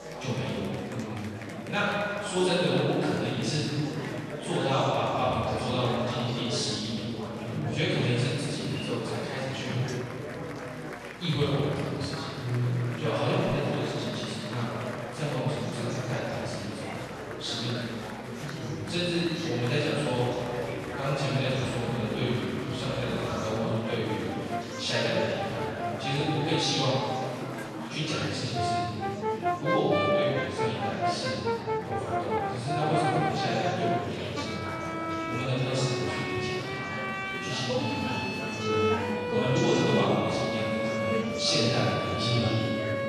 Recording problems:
room echo; strong; dies away in 2.5 s
off-mic speech; far
background music; loud; throughout; 3 dB below the speech
murmuring crowd; loud; throughout; 7 dB below the speech
clattering dishes; faint; at 10 s and at 27 s; peak 15 dB below the speech

